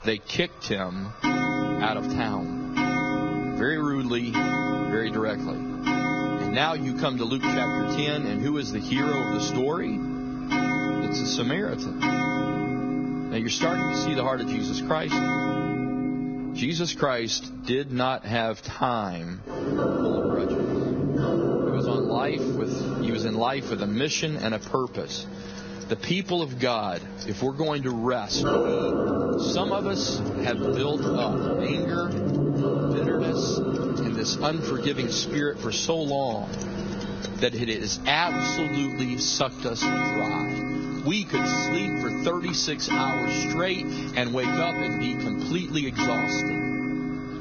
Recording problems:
garbled, watery; badly; nothing above 6.5 kHz
squashed, flat; somewhat
household noises; very loud; throughout; 1 dB above the speech
rain or running water; noticeable; from 24 s on; 20 dB below the speech

